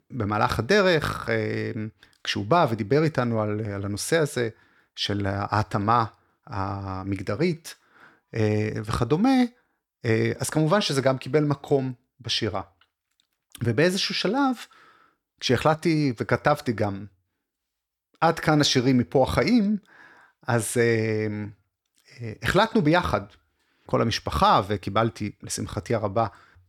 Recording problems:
none

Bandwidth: 18.5 kHz